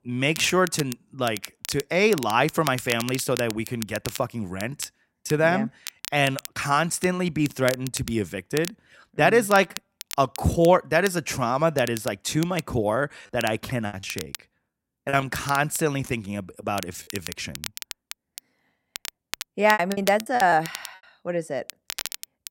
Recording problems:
crackle, like an old record; noticeable; 15 dB below the speech
choppy; very; from 14 to 17 s and at 20 s; 11% of the speech affected

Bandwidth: 16 kHz